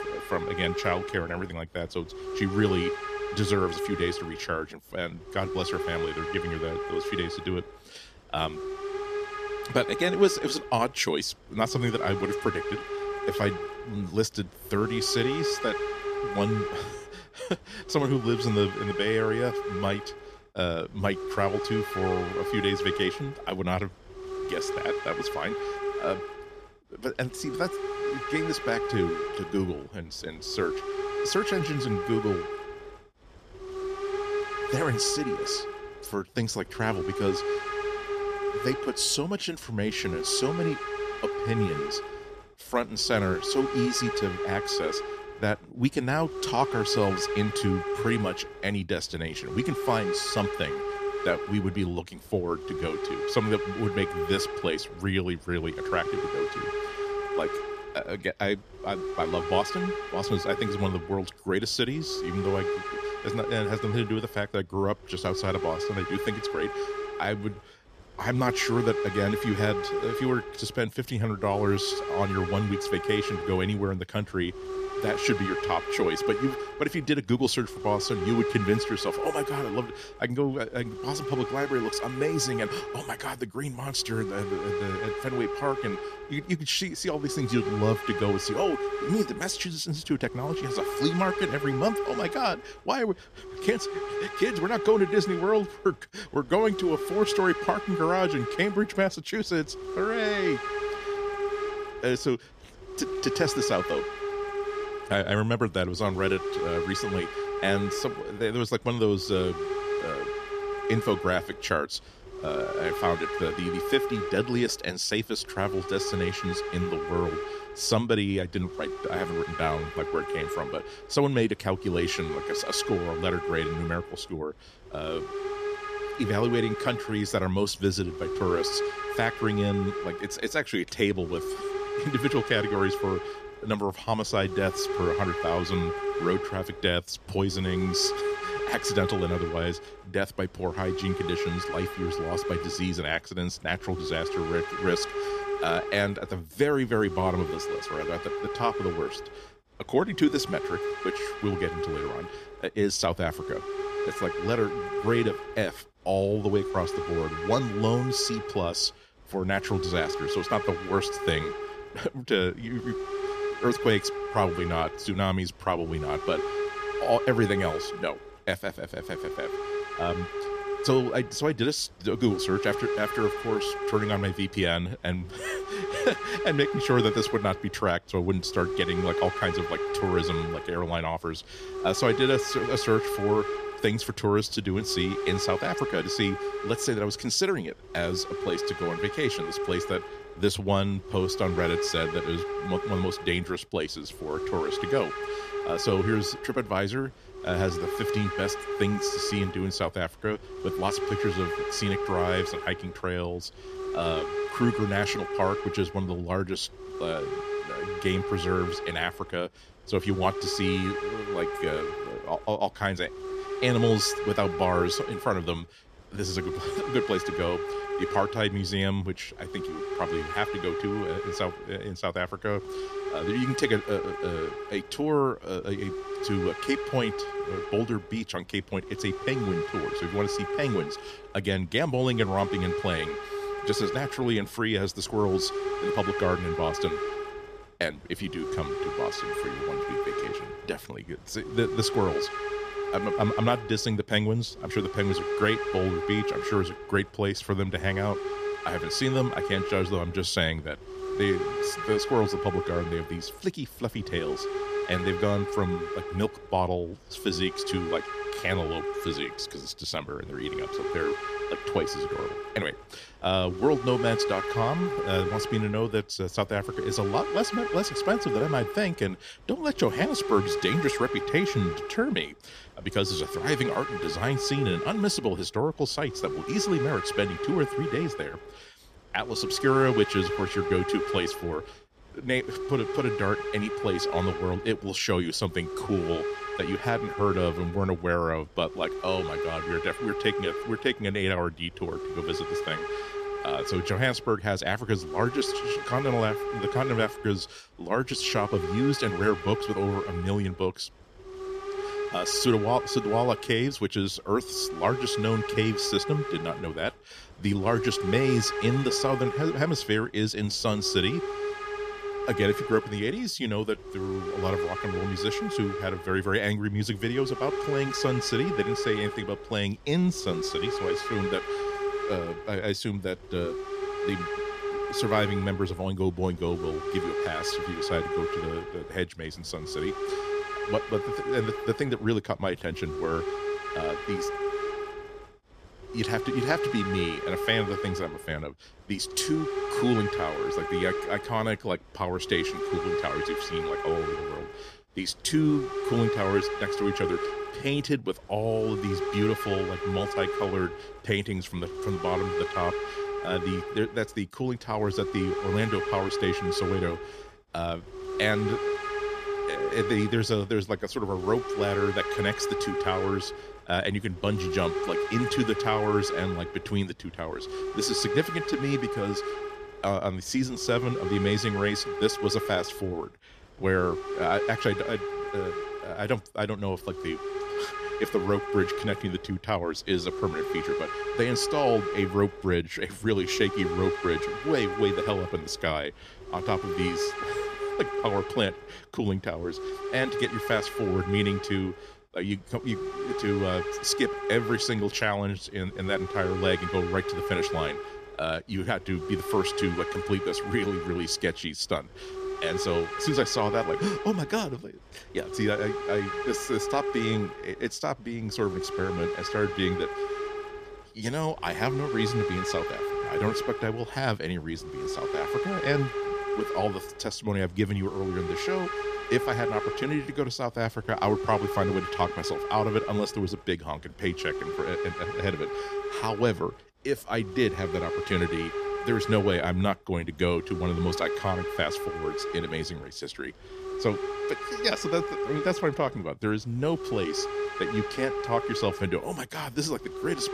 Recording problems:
hiss; loud; throughout; 4 dB below the speech

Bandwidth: 14.5 kHz